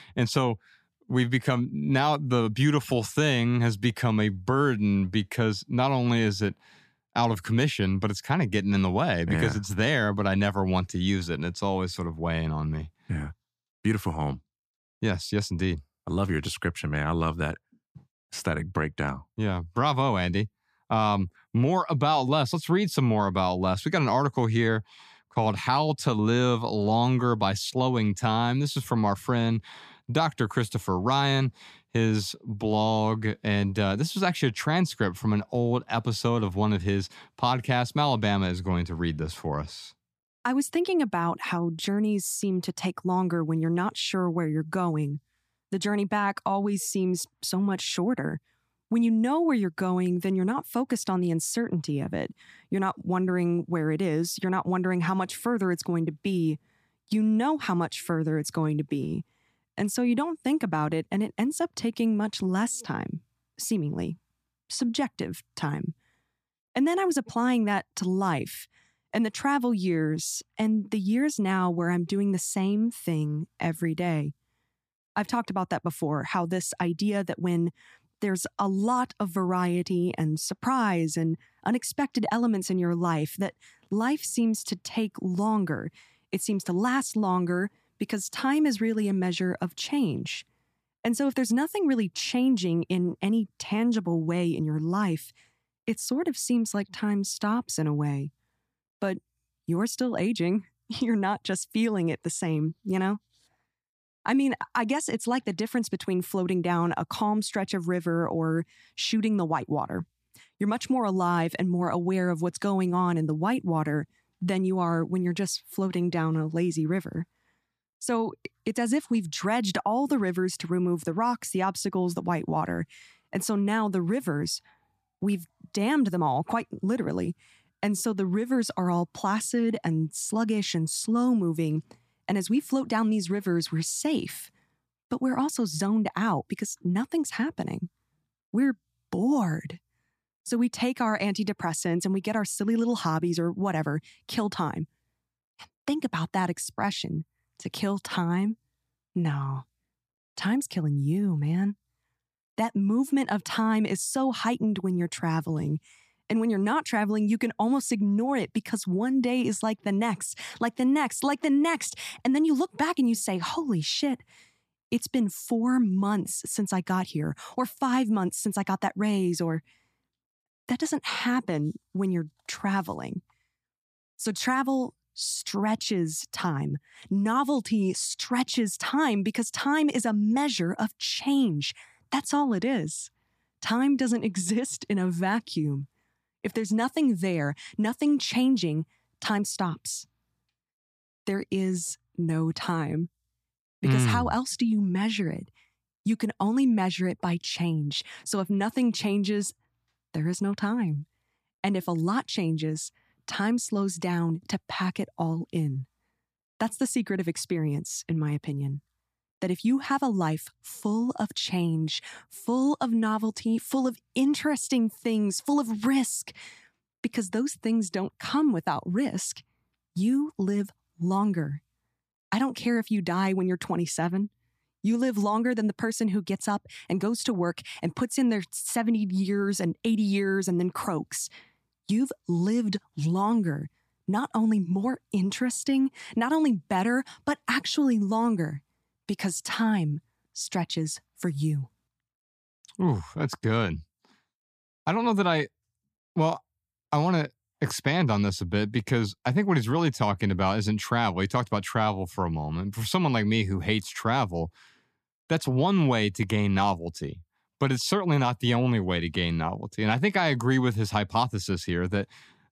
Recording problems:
none

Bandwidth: 14.5 kHz